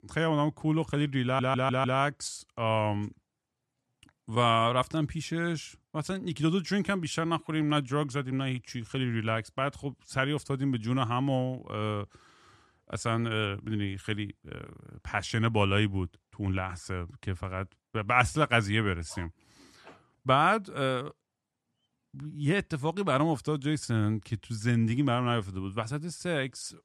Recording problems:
audio stuttering; at 1 s

